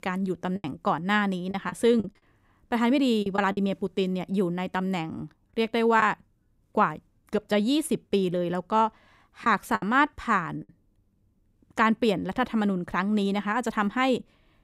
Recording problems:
choppy; very; from 0.5 to 3.5 s and from 9.5 to 11 s; 8% of the speech affected

